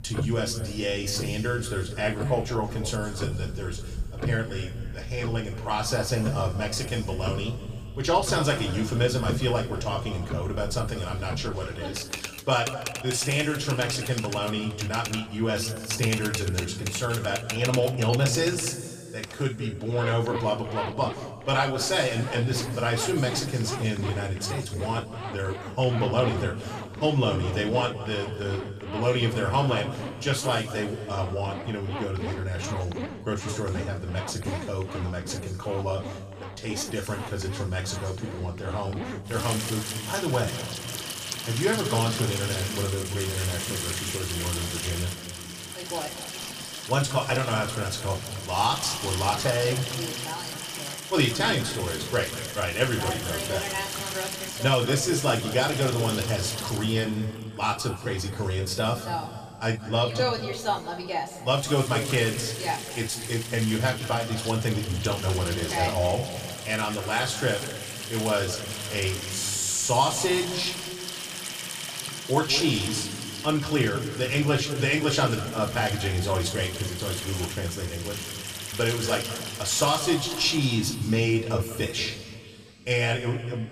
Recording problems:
room echo; noticeable; dies away in 2 s
off-mic speech; somewhat distant
household noises; loud; throughout; 8 dB below the speech

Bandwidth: 15 kHz